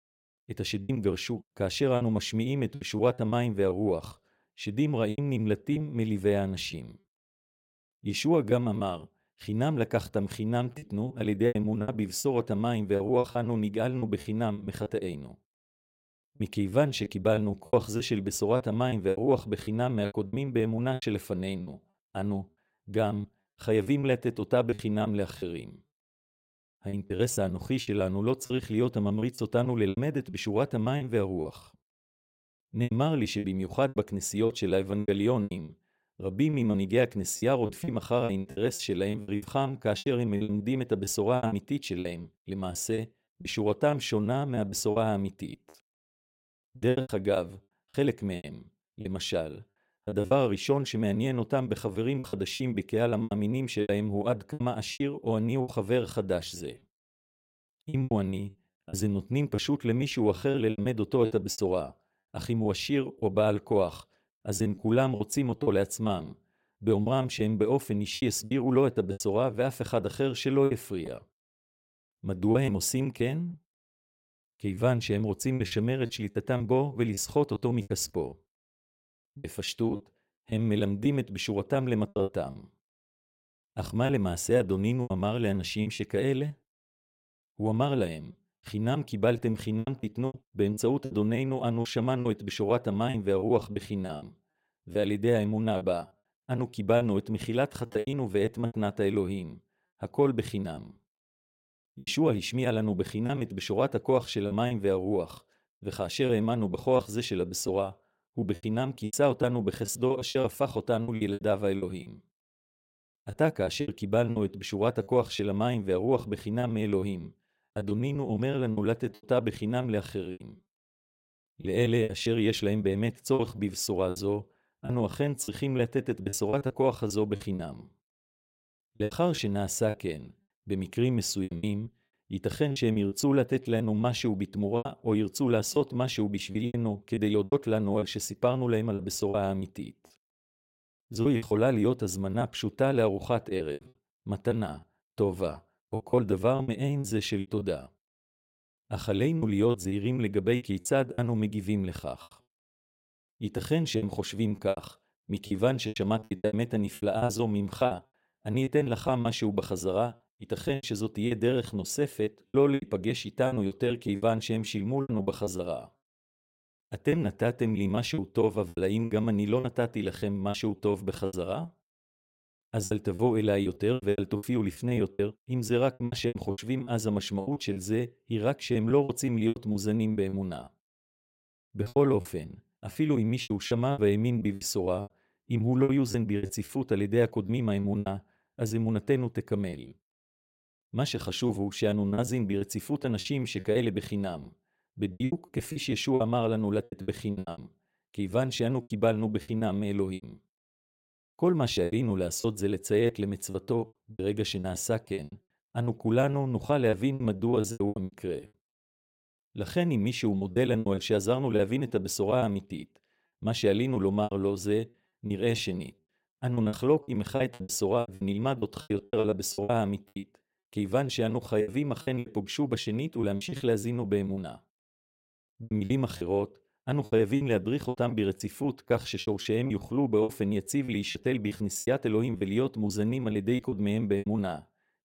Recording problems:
choppy; very; 12% of the speech affected

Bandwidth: 16 kHz